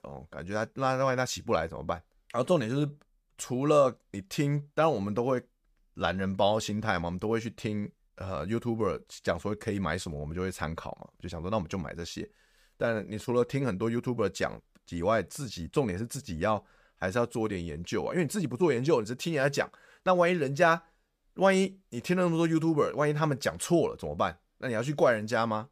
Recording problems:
none

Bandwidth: 15 kHz